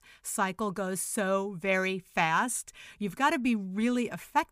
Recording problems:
none

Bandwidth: 15 kHz